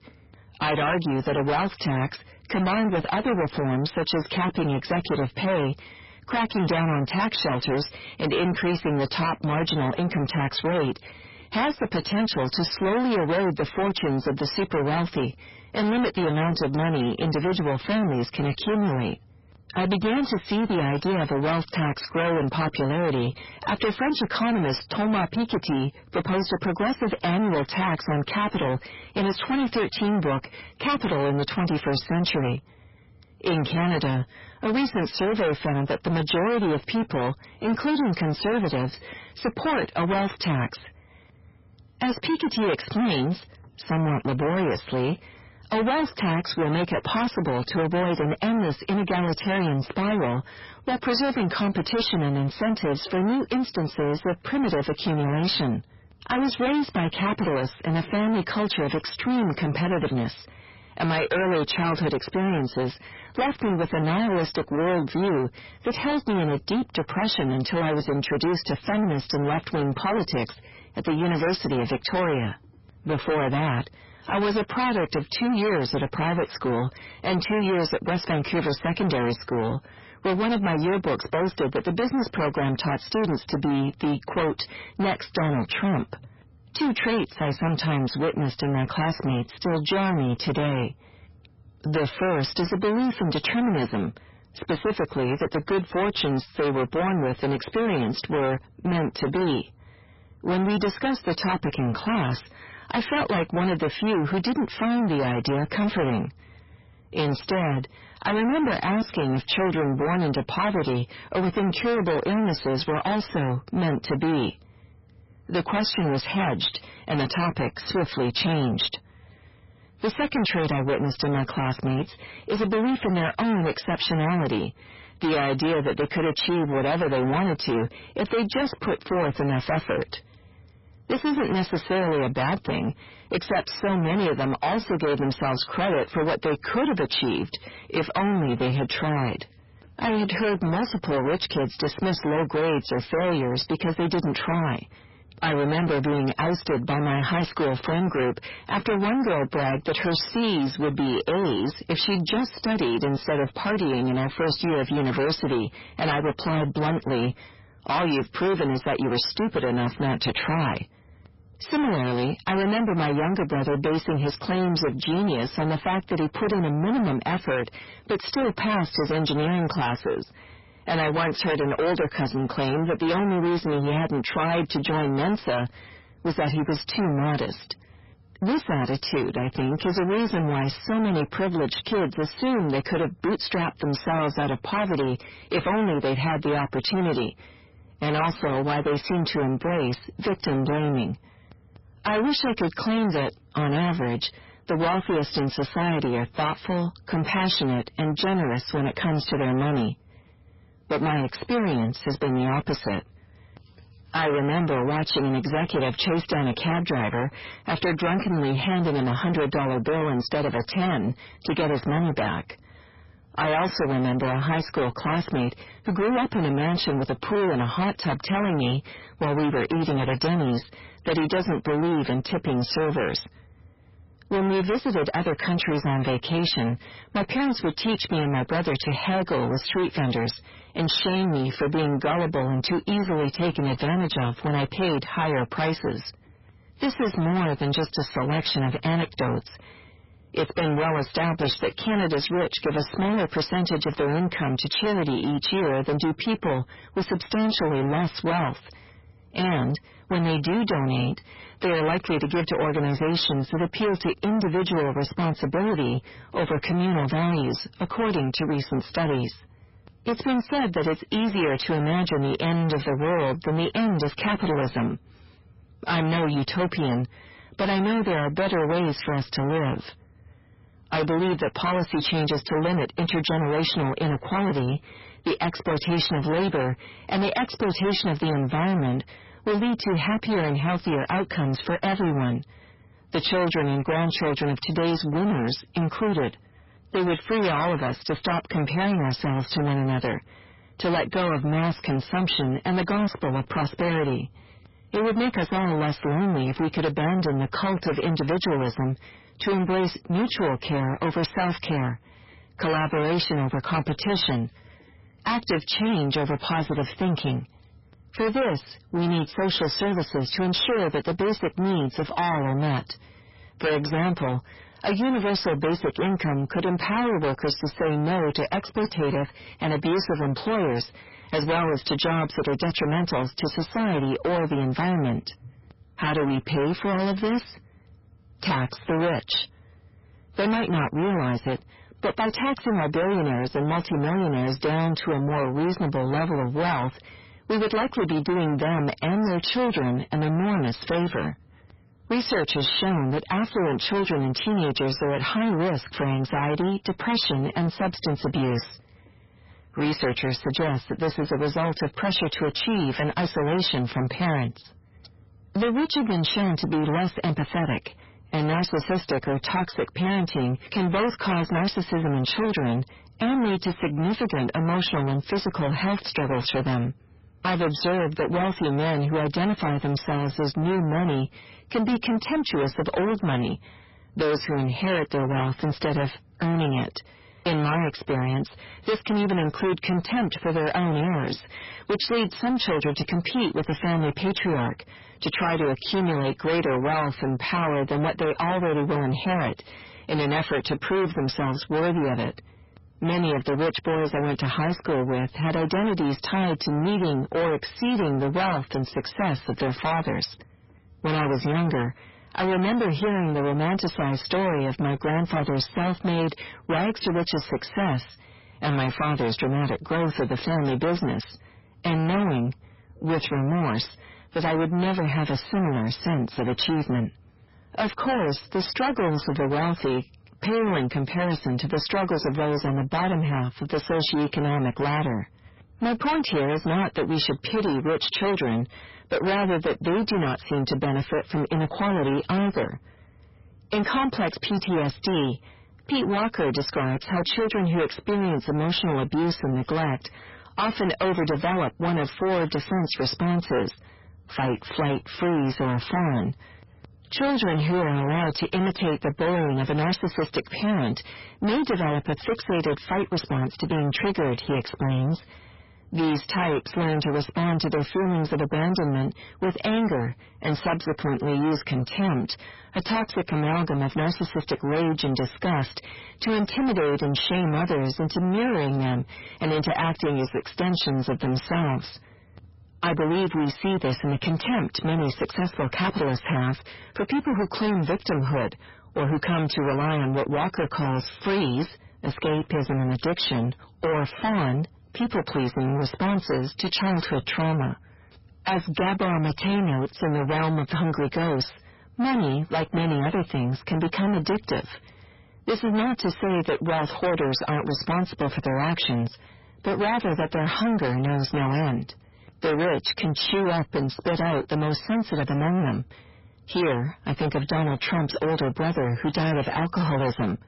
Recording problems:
distortion; heavy; 5 dB below the speech
garbled, watery; badly; nothing above 5.5 kHz

